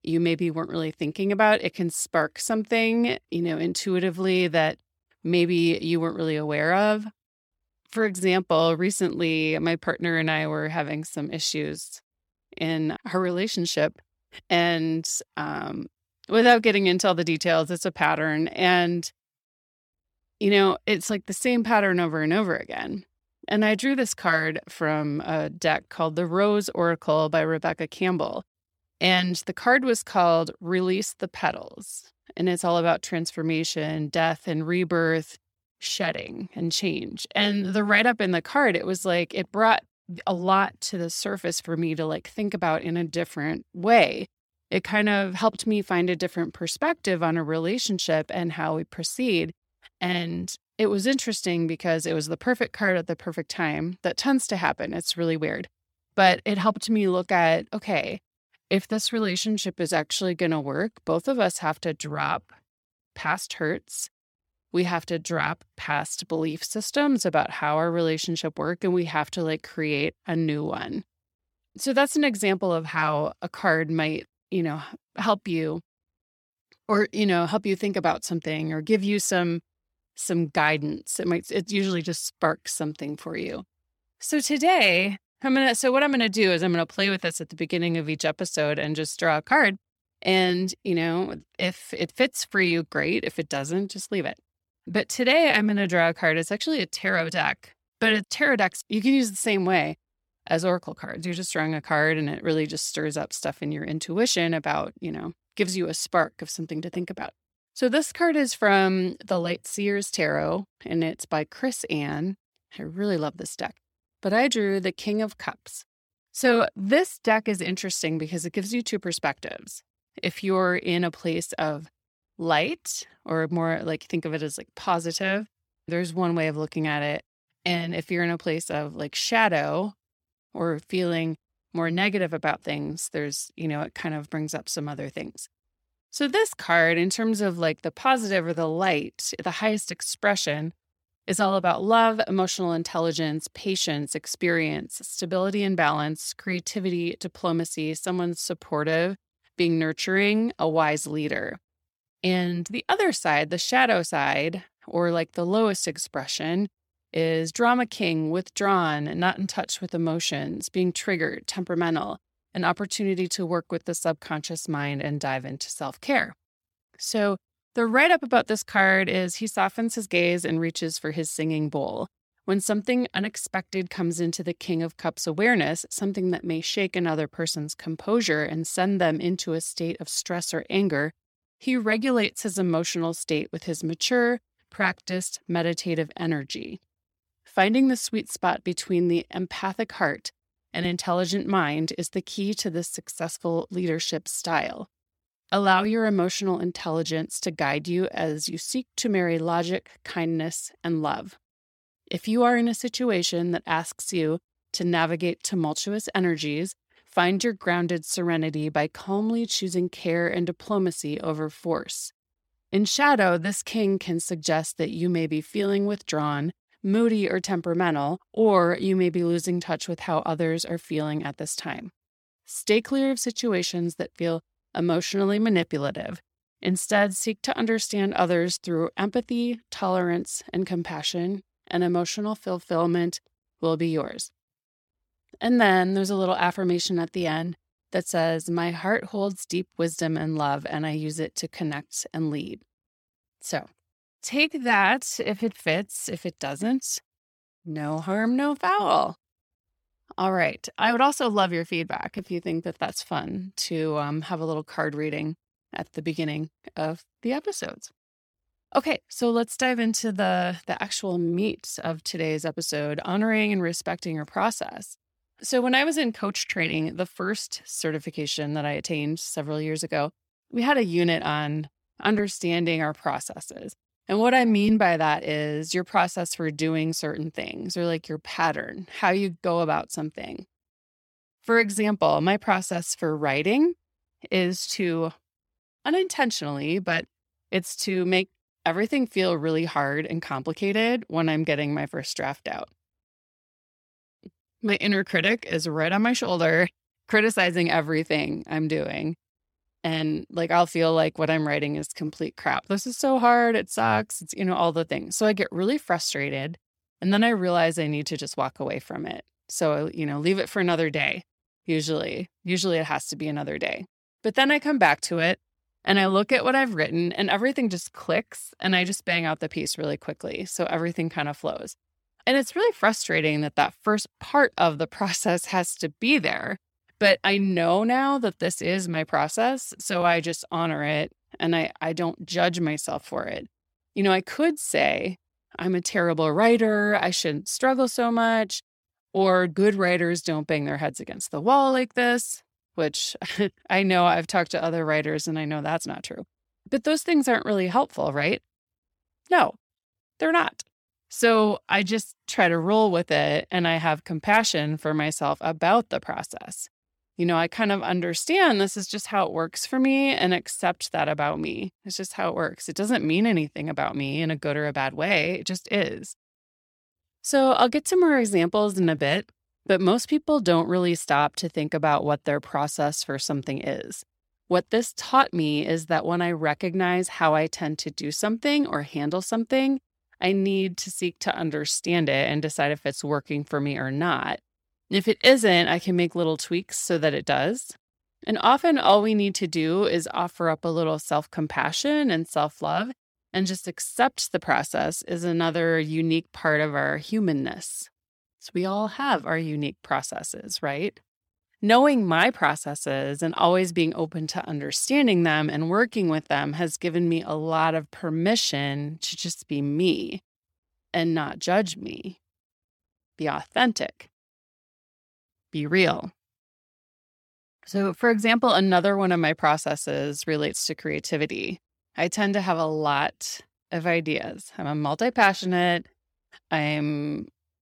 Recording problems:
none

